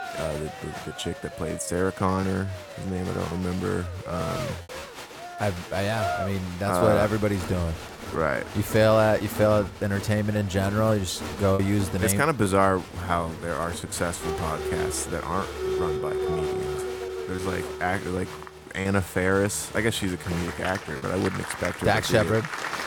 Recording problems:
crowd noise; loud; throughout; 8 dB below the speech
choppy; occasionally; 2% of the speech affected

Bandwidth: 18 kHz